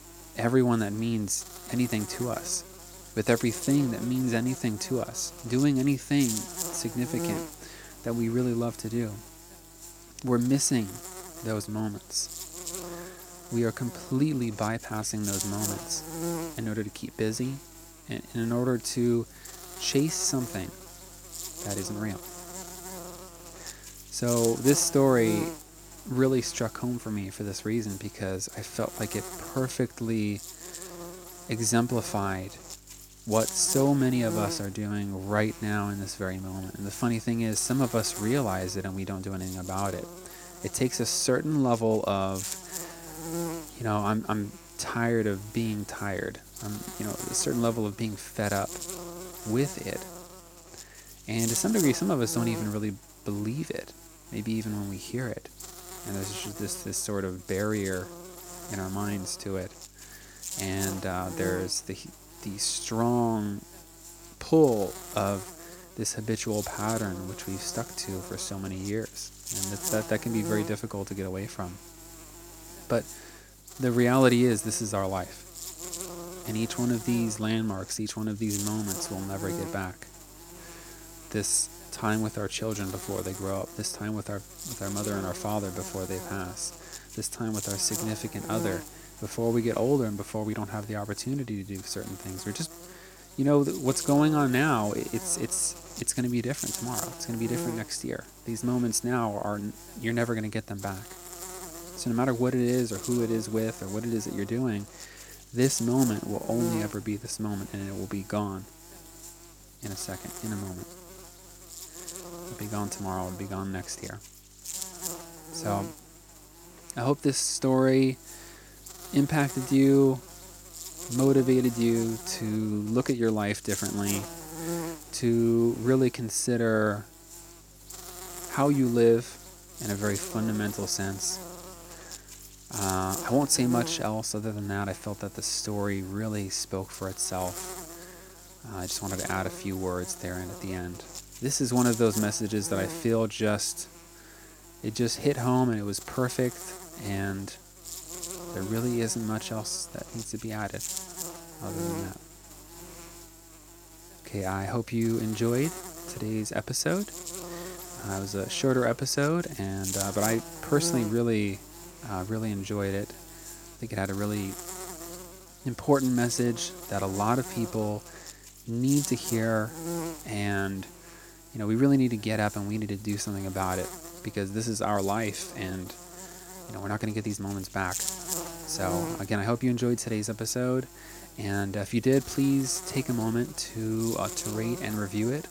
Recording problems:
electrical hum; loud; throughout; 50 Hz, 10 dB below the speech

